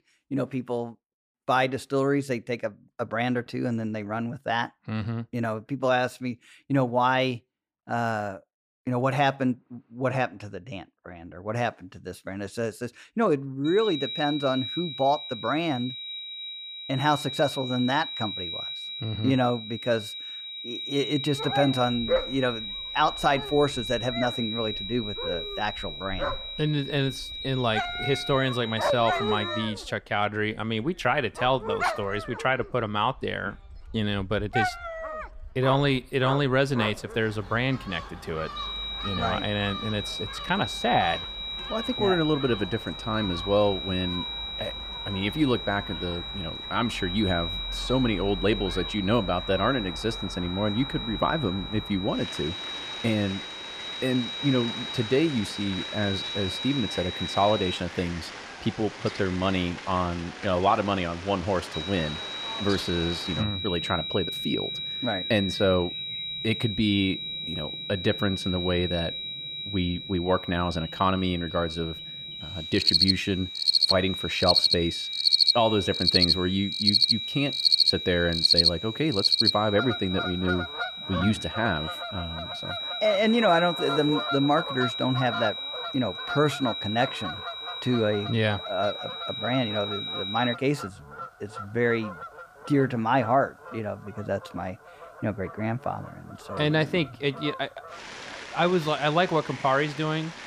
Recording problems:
high-pitched whine; loud; from 14 to 30 s, from 39 to 58 s and from 1:02 to 1:31; 4 kHz, 5 dB below the speech
animal sounds; loud; from 21 s on; 2 dB below the speech

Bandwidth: 15 kHz